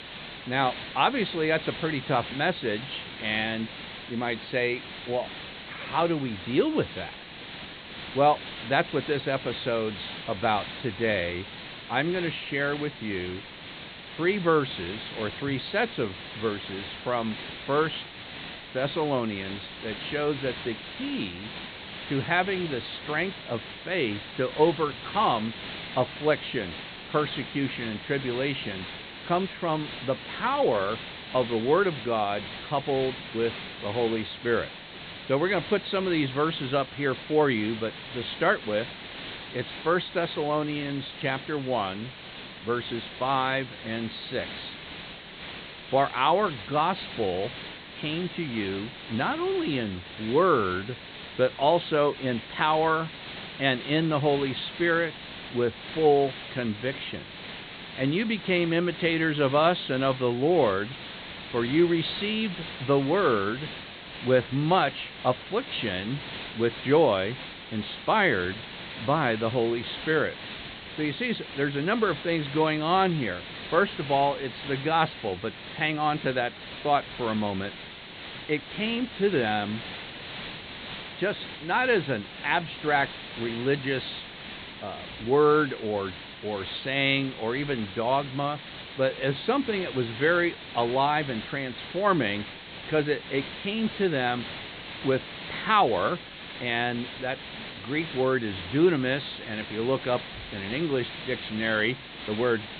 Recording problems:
high frequencies cut off; severe; nothing above 4 kHz
hiss; noticeable; throughout; 10 dB below the speech

